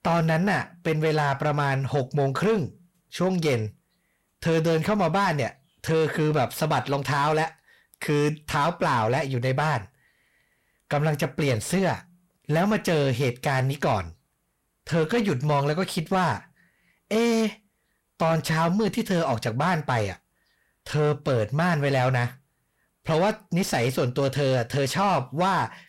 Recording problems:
distortion; slight; 10 dB below the speech

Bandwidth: 16 kHz